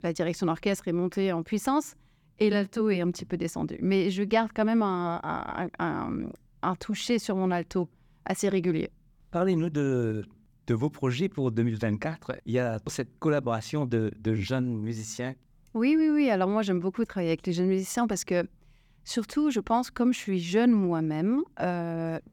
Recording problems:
none

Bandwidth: 19 kHz